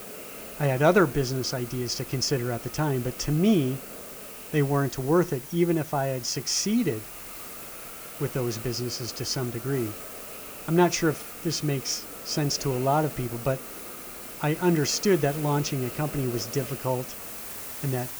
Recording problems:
hiss; noticeable; throughout; 10 dB below the speech
high-pitched whine; faint; throughout; 11 kHz, 35 dB below the speech

